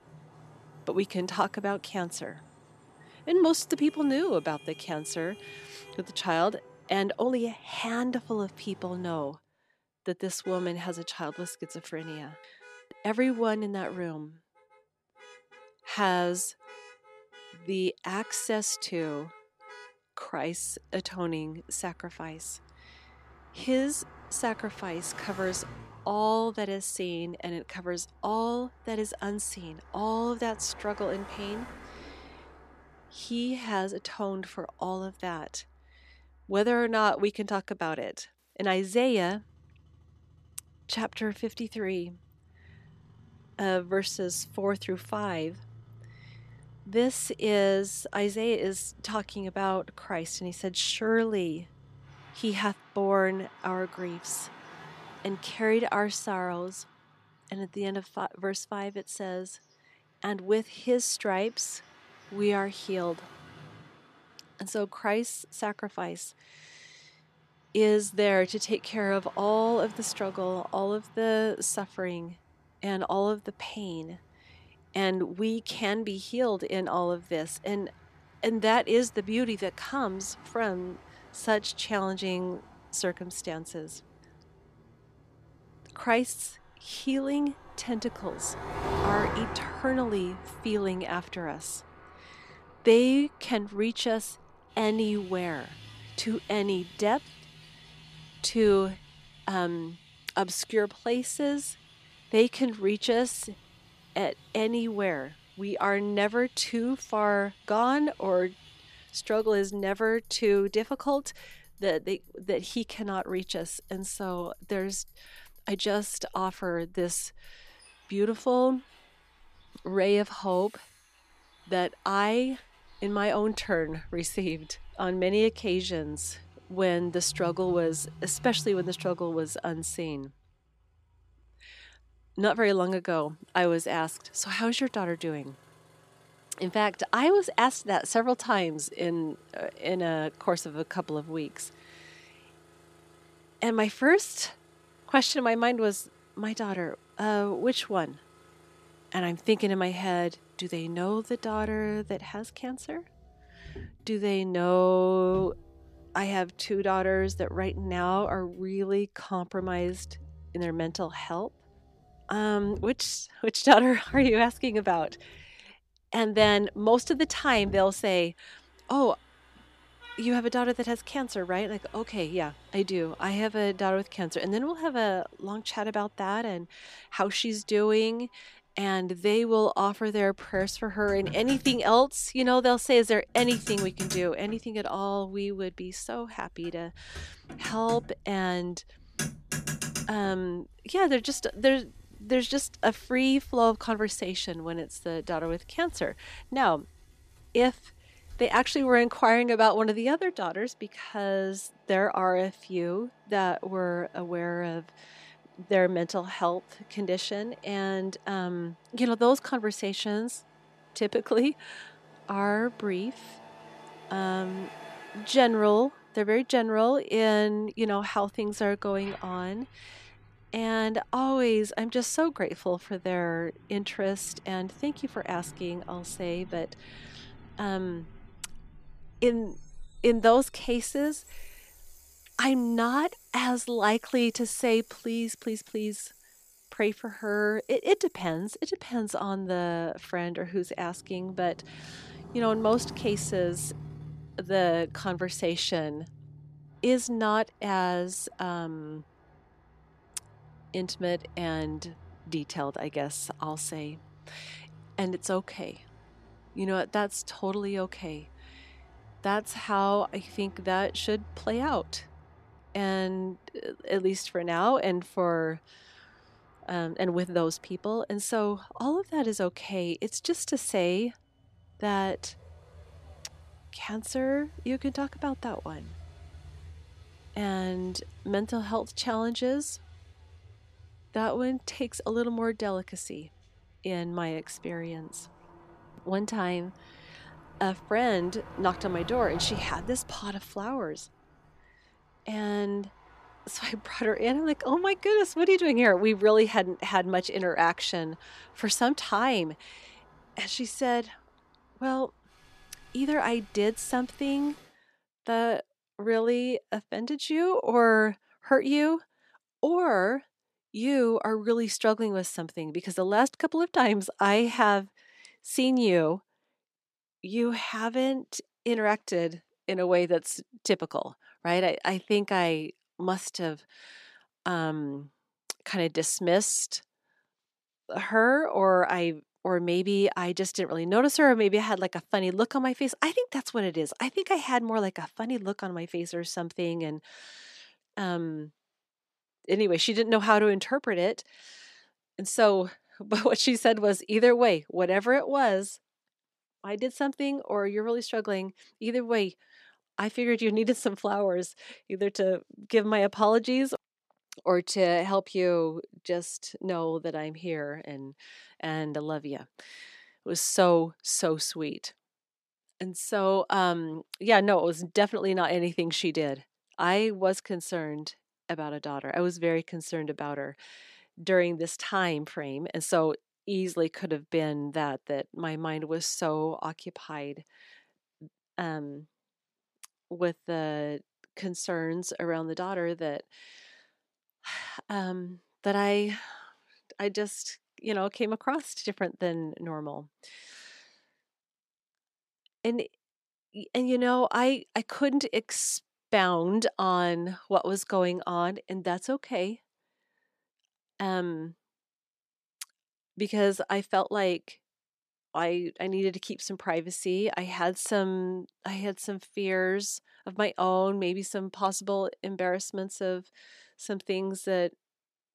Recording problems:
traffic noise; noticeable; until 5:04; 20 dB below the speech

